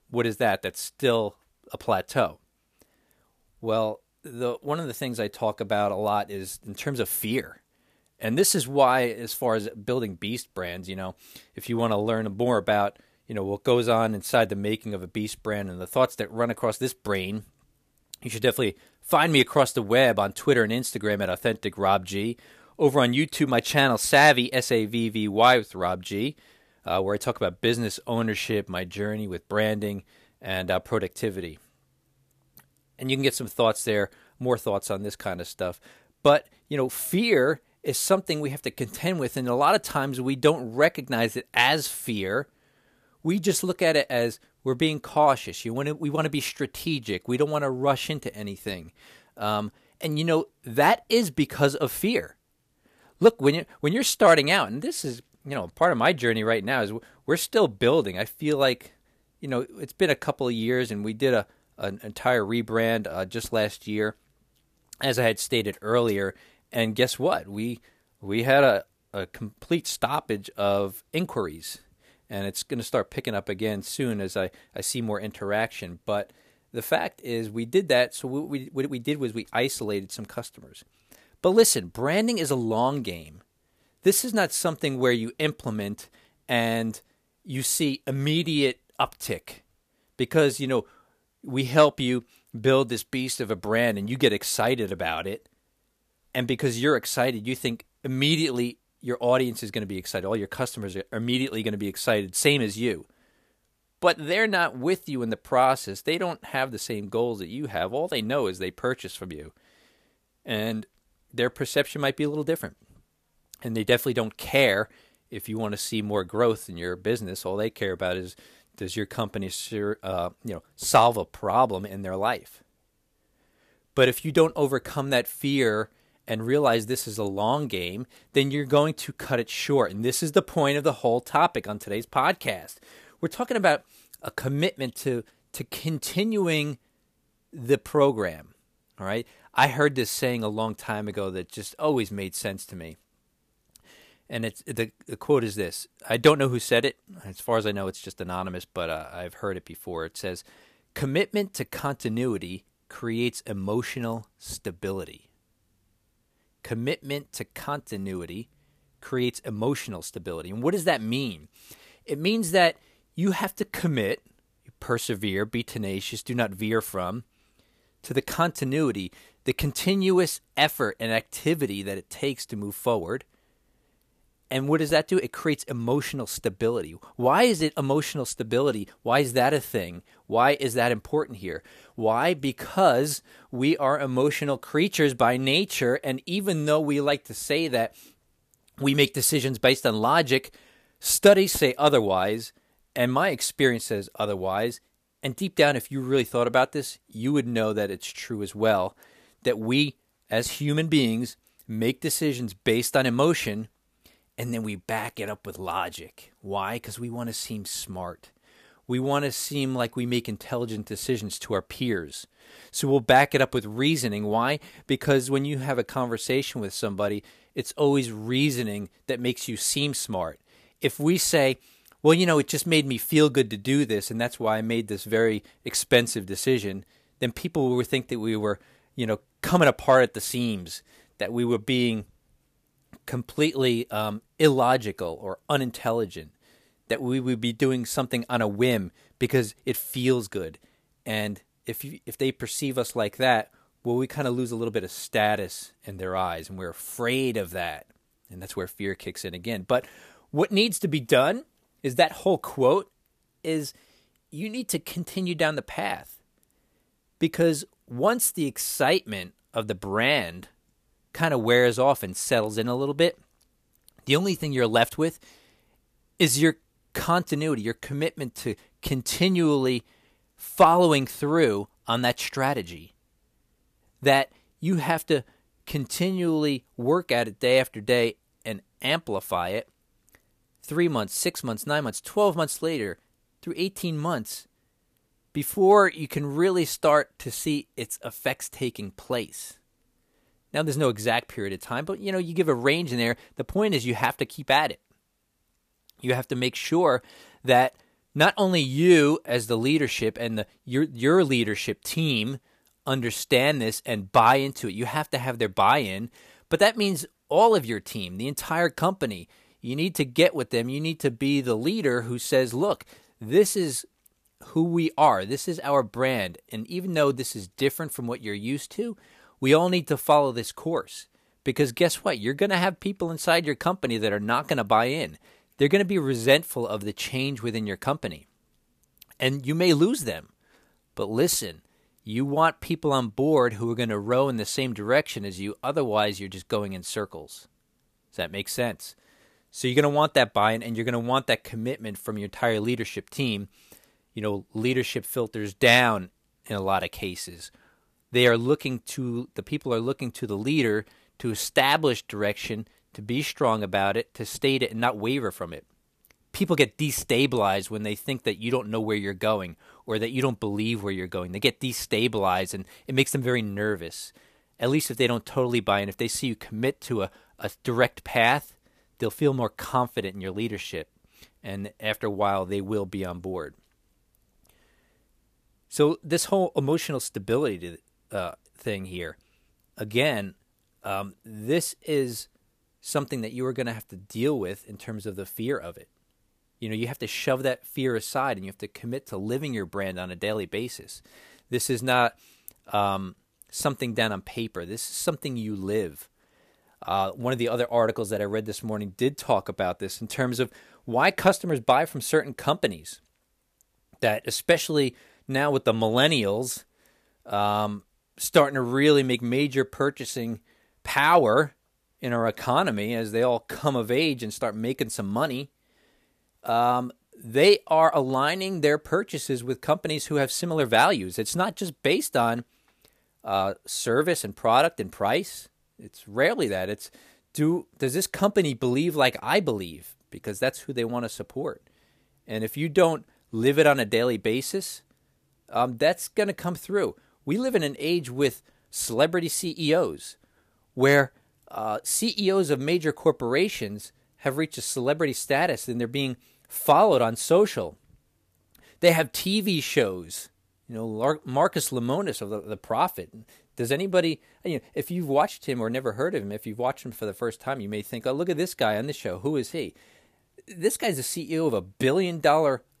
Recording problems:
none

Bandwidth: 14.5 kHz